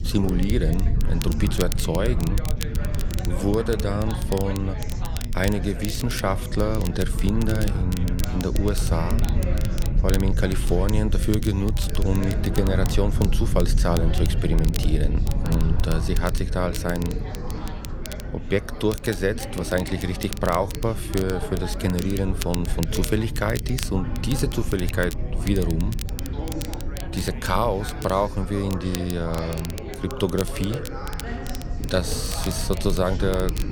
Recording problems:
background chatter; noticeable; throughout; 4 voices, 10 dB below the speech
low rumble; noticeable; throughout; 15 dB below the speech
crackle, like an old record; noticeable; 15 dB below the speech

